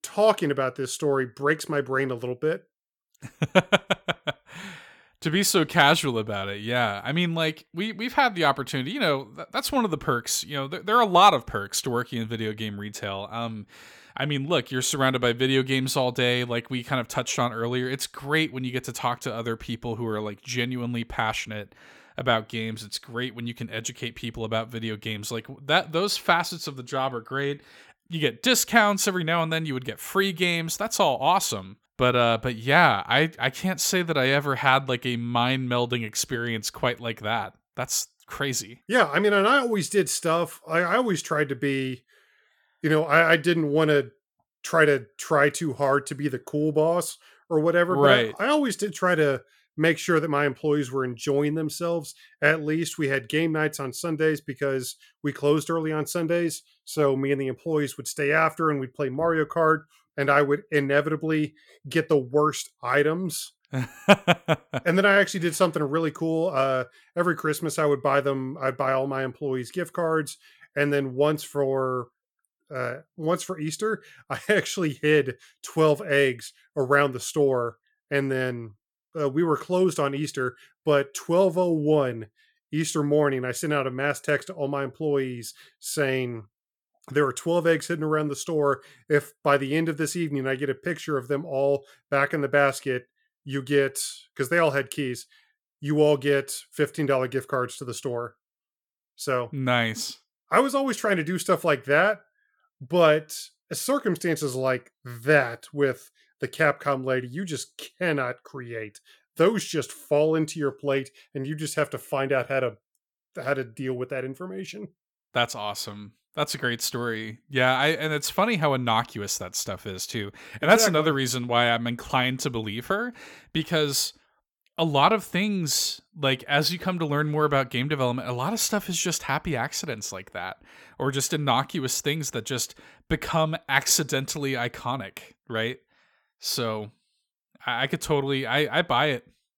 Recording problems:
none

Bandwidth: 17.5 kHz